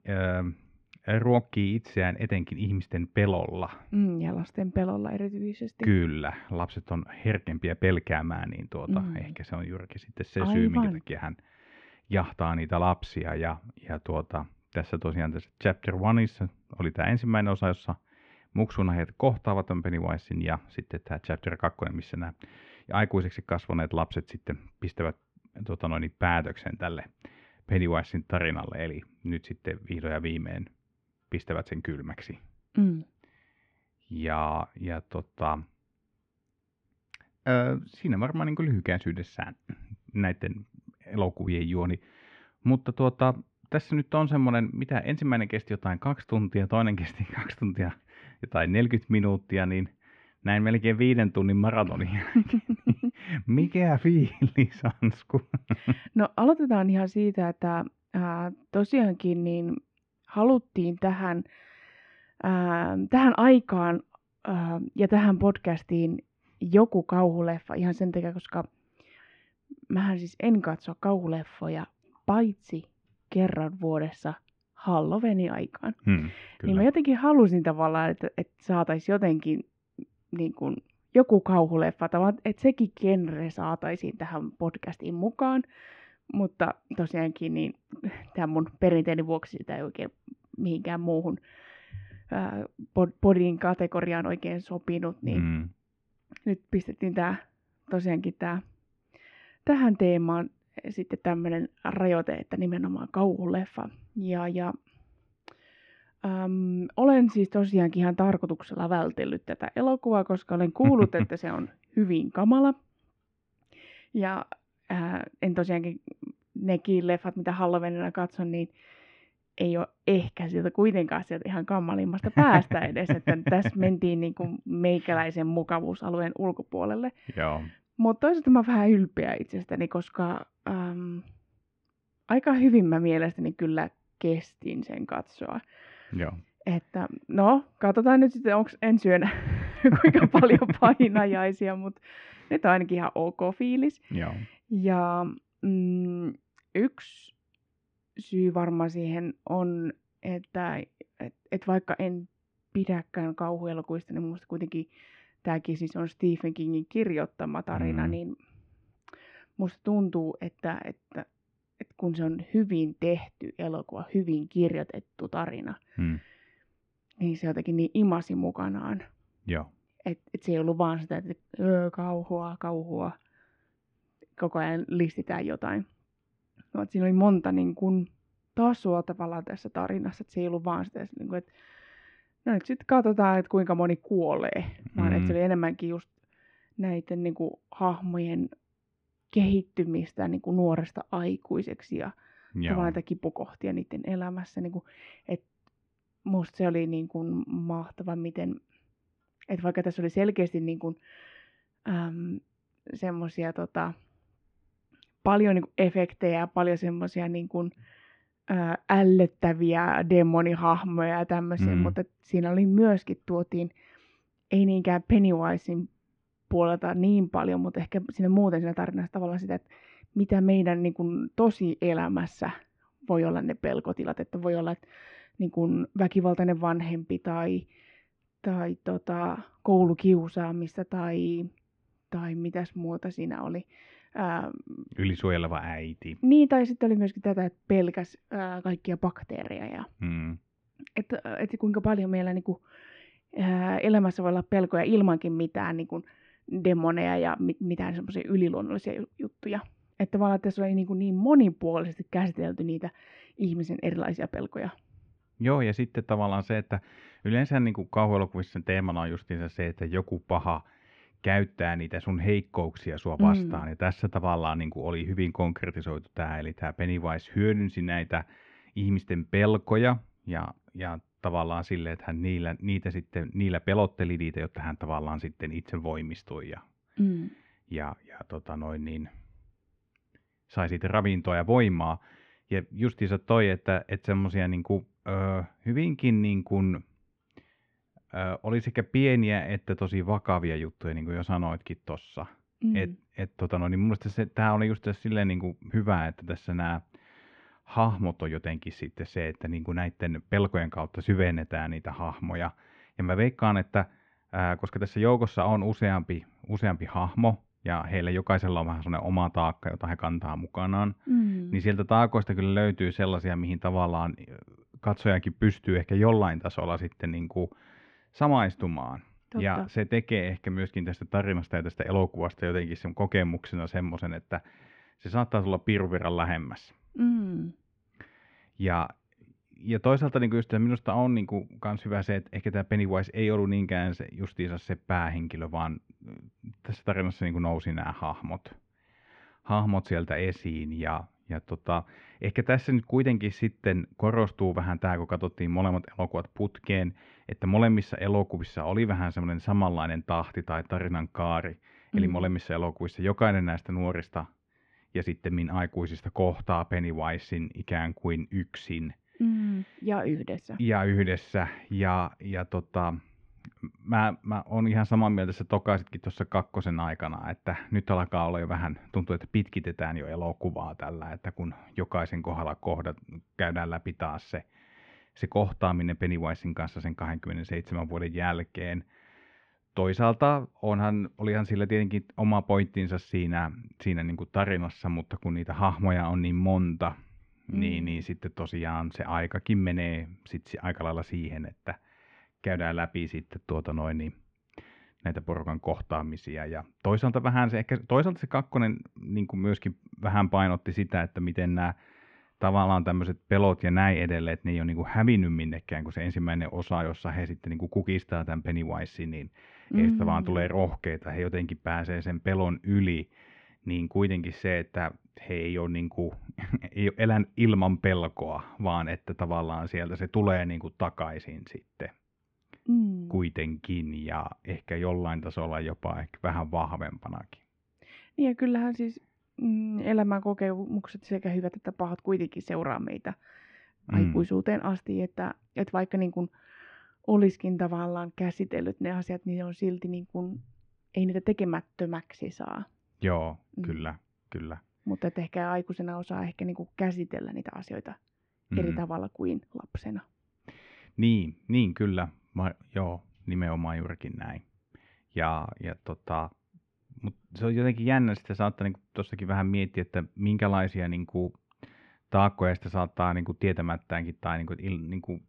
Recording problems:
muffled; very; fading above 2.5 kHz

